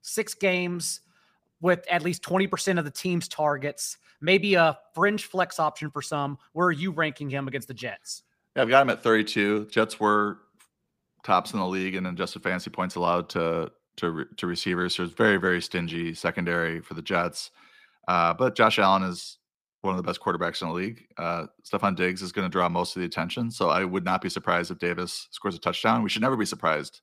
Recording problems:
none

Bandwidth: 15 kHz